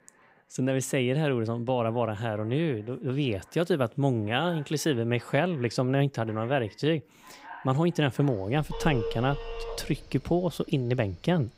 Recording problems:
alarms or sirens; noticeable; throughout; 15 dB below the speech

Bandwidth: 15.5 kHz